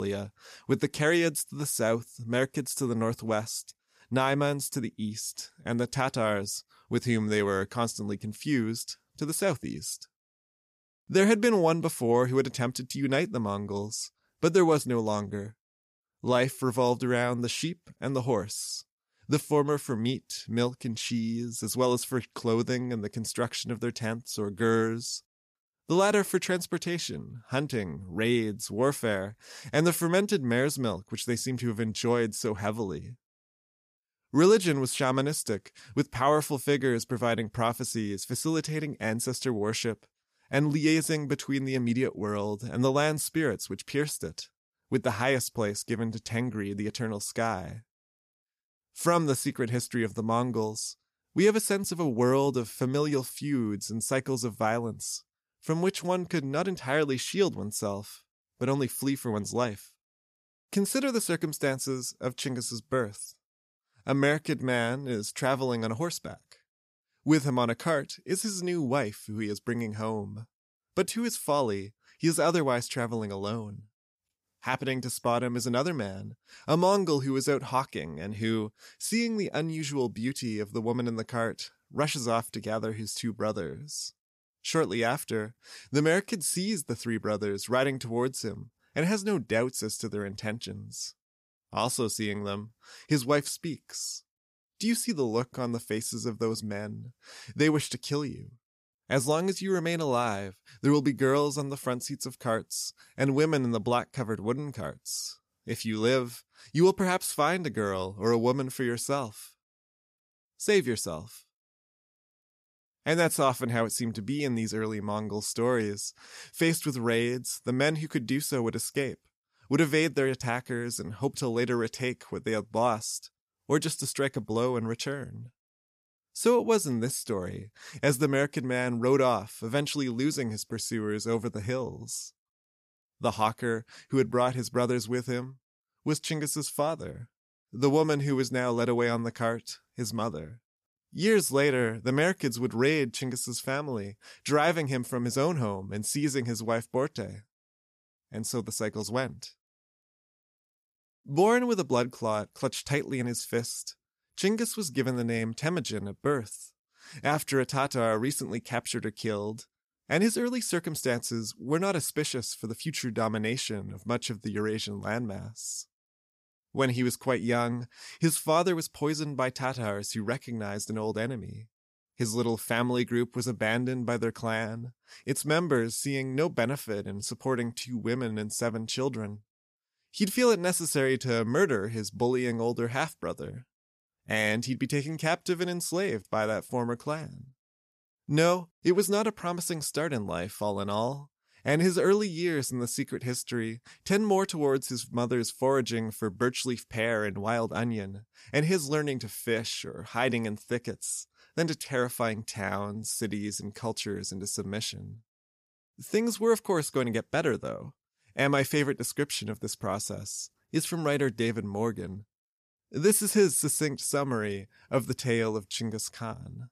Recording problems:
abrupt cut into speech; at the start

